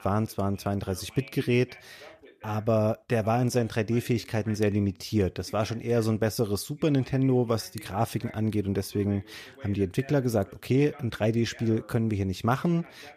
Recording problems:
voice in the background; faint; throughout; 20 dB below the speech

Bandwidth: 14.5 kHz